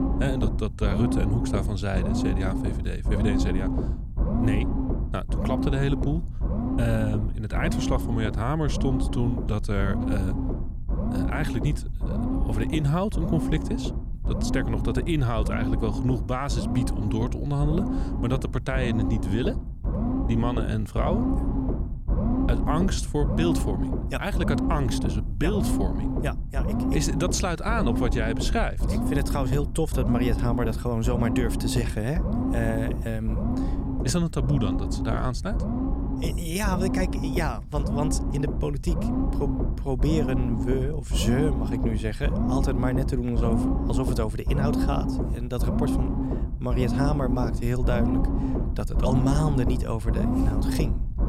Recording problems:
low rumble; loud; throughout; 3 dB below the speech

